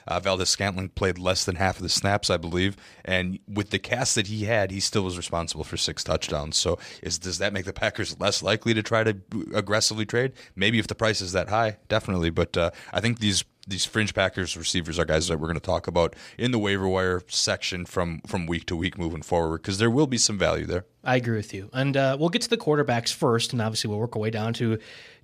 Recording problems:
none

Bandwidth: 14.5 kHz